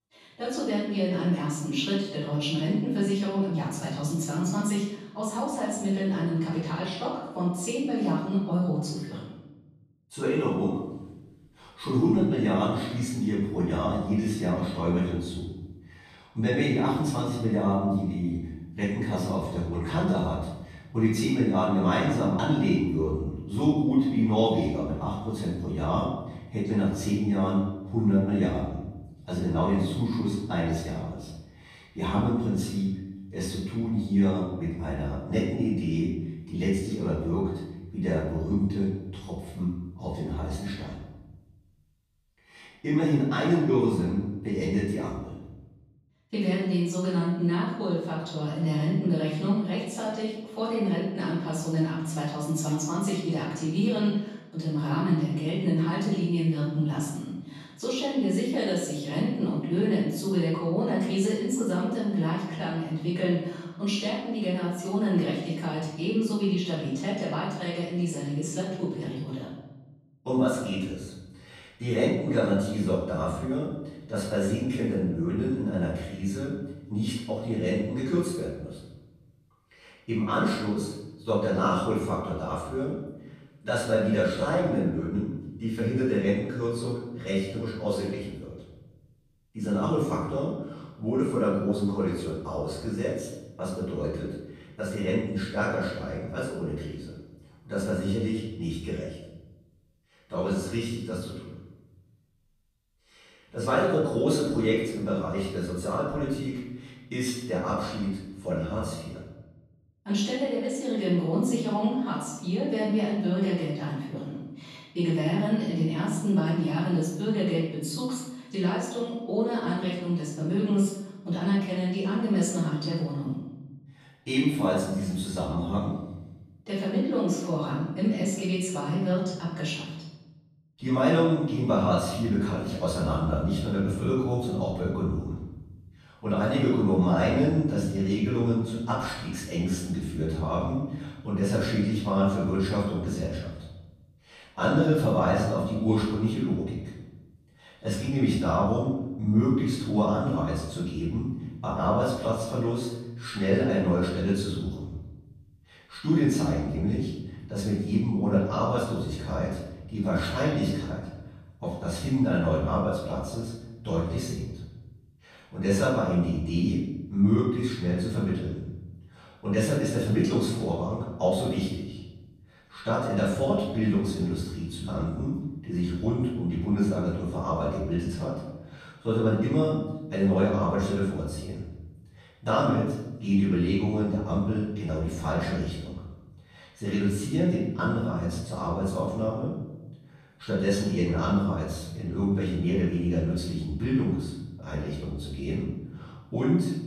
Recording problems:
off-mic speech; far
room echo; noticeable; dies away in 0.9 s

